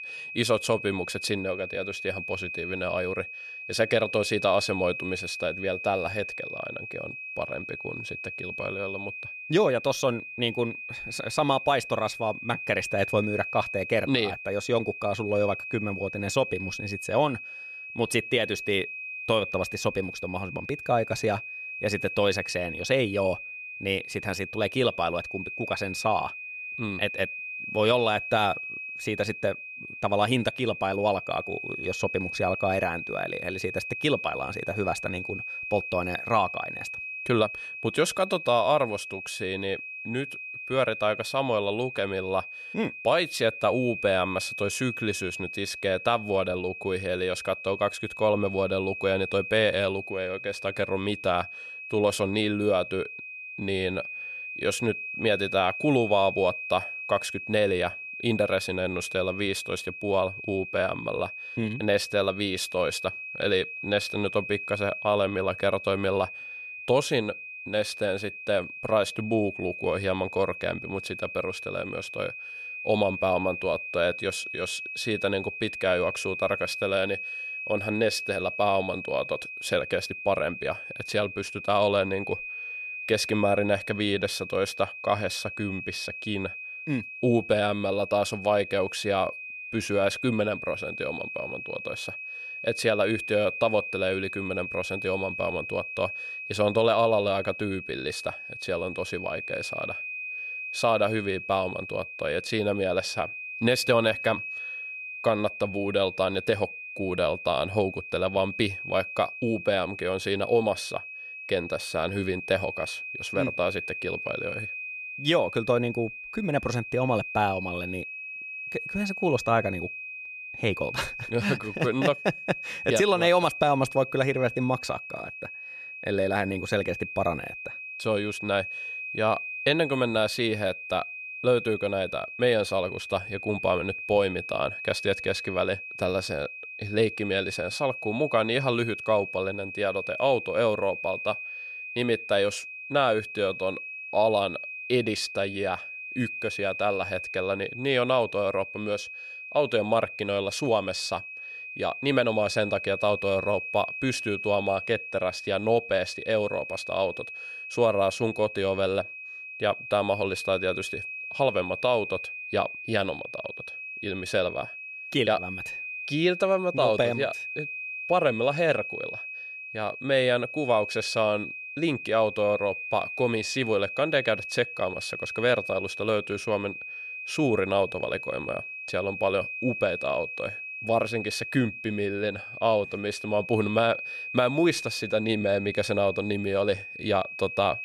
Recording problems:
high-pitched whine; loud; throughout; 2.5 kHz, 7 dB below the speech

